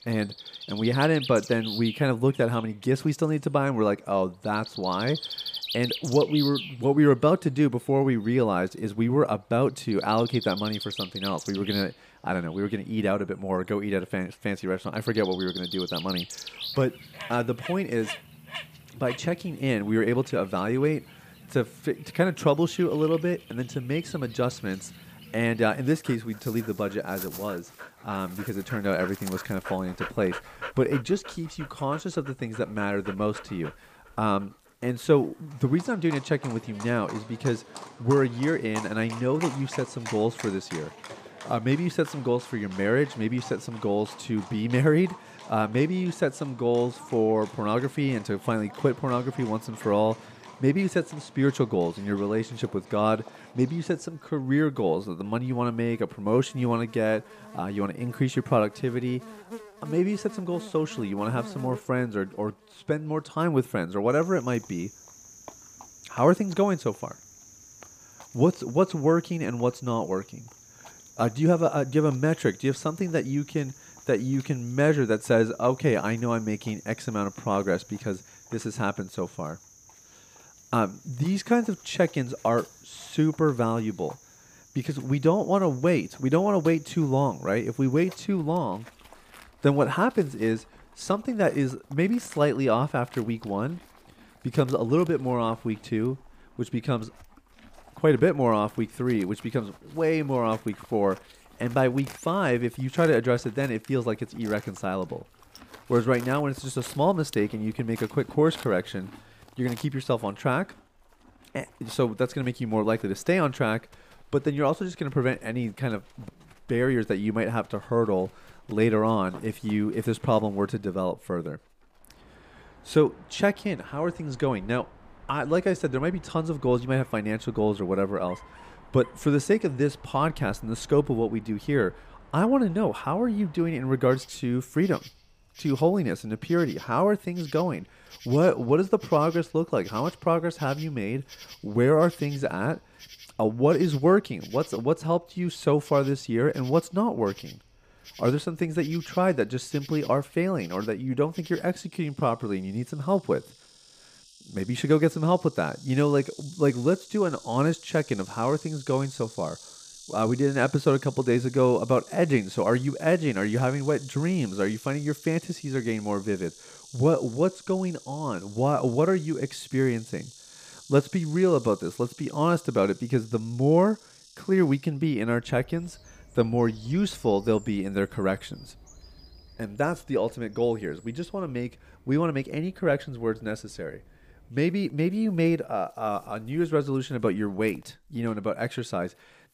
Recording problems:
animal sounds; noticeable; throughout; 15 dB below the speech

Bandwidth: 15 kHz